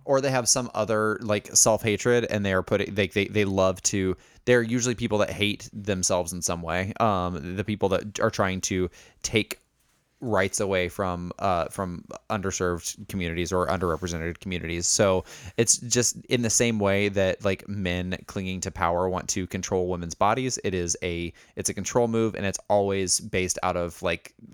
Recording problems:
none

